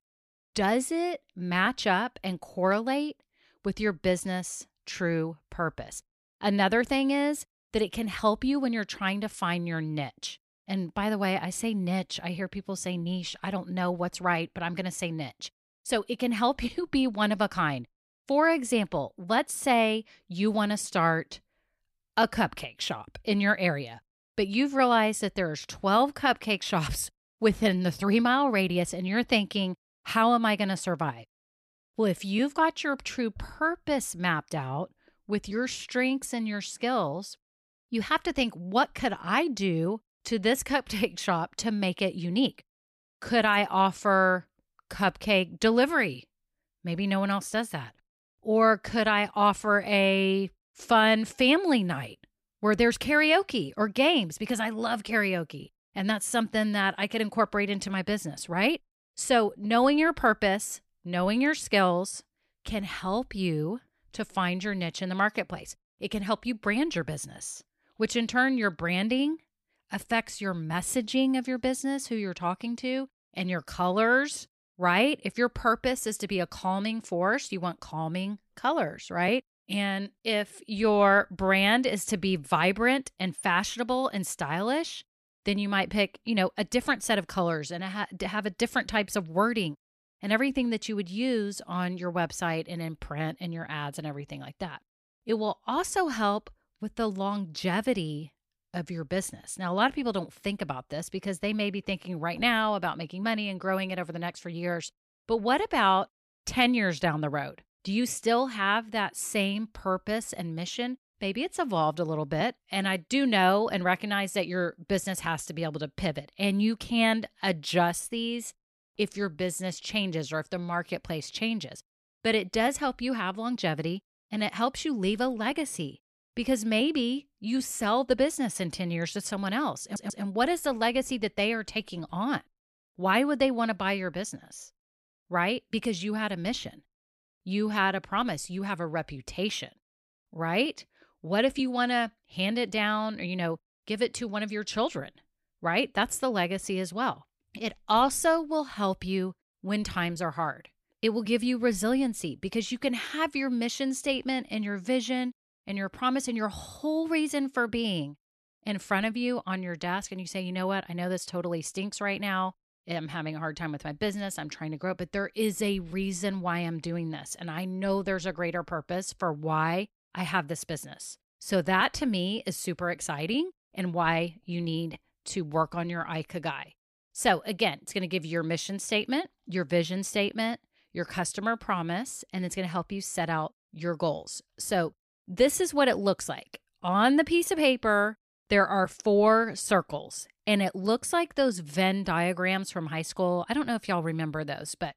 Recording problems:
audio stuttering; at 2:10

